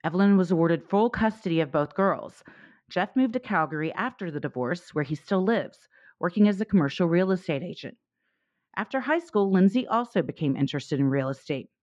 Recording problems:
muffled; very; fading above 2 kHz

